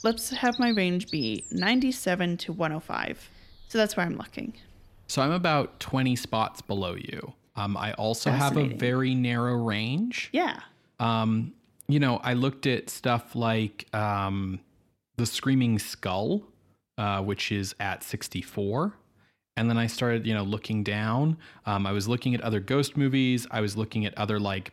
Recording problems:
animal sounds; loud; until 7 s; 9 dB below the speech

